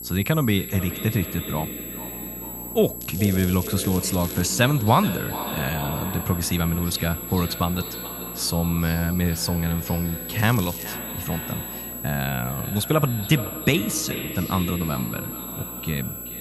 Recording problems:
echo of what is said; strong; throughout; 430 ms later, 10 dB below the speech
high-pitched whine; loud; throughout; 11.5 kHz, 8 dB below the speech
crackling; noticeable; from 3 to 4.5 s and at 10 s; 15 dB below the speech
electrical hum; faint; throughout; 60 Hz, 20 dB below the speech

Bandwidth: 14 kHz